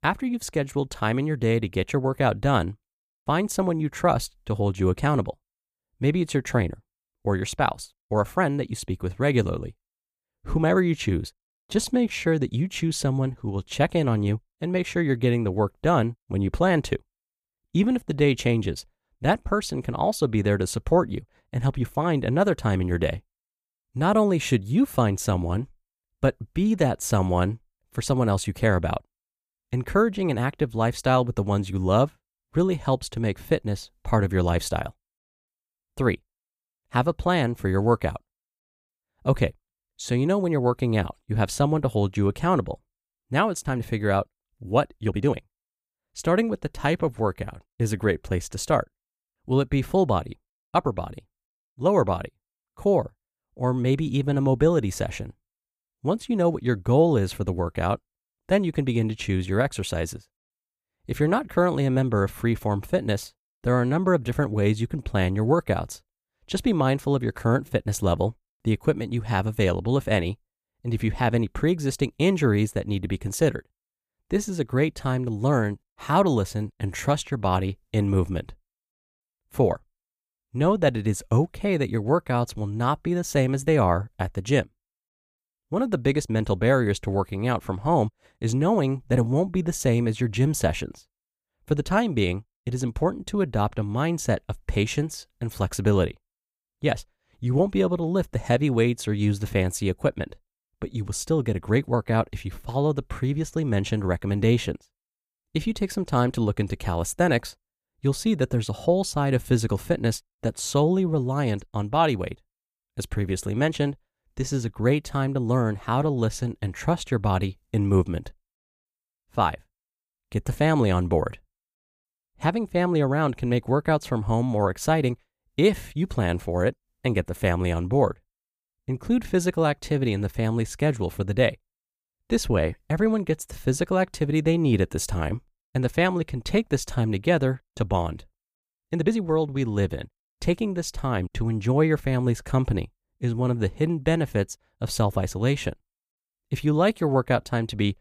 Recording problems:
uneven, jittery; strongly; from 8 s to 2:19

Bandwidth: 15 kHz